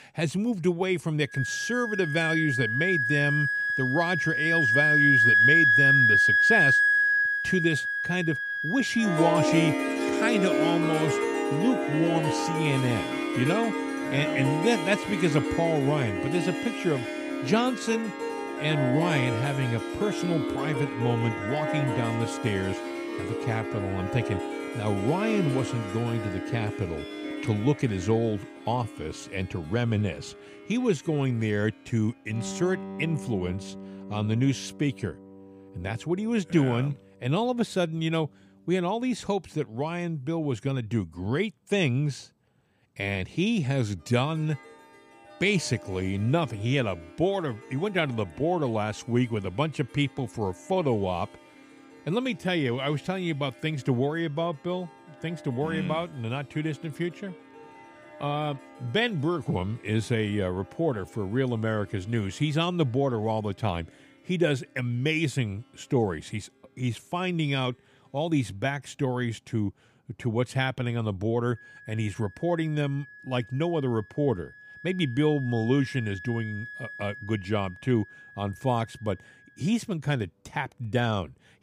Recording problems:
background music; very loud; throughout; 2 dB above the speech

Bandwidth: 15 kHz